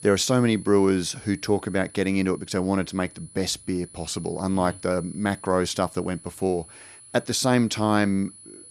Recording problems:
high-pitched whine; noticeable; throughout; 10 kHz, 20 dB below the speech

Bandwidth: 14 kHz